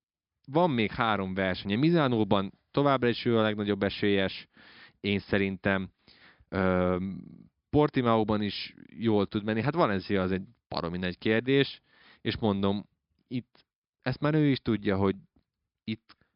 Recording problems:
high frequencies cut off; noticeable; nothing above 5.5 kHz

